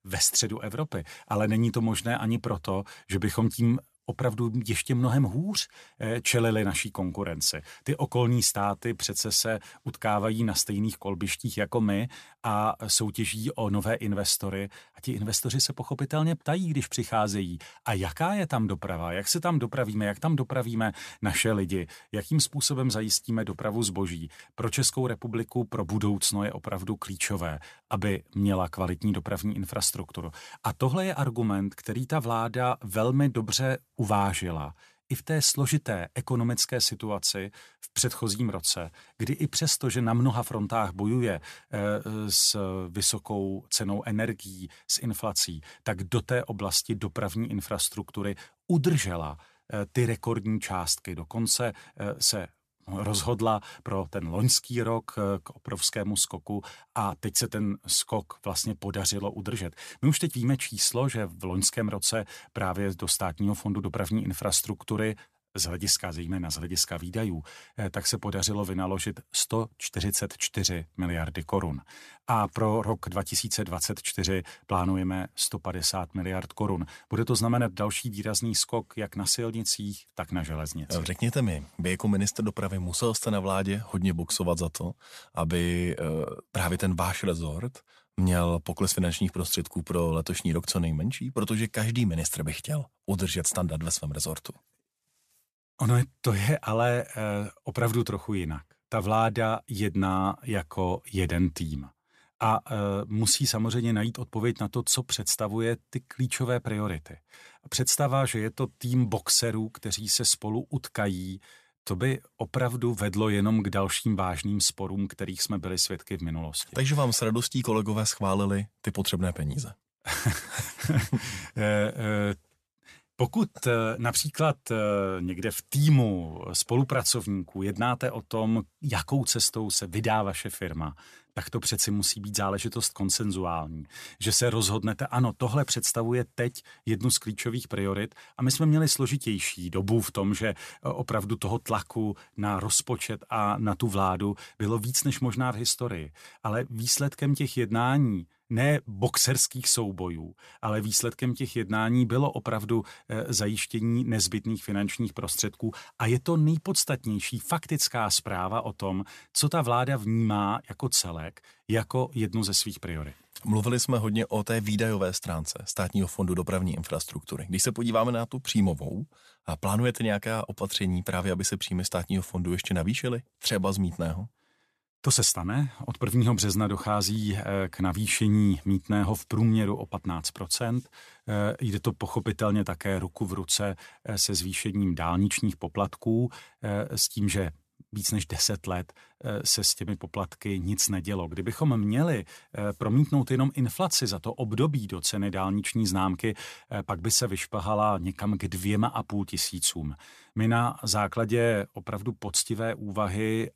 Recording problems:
none

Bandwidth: 14.5 kHz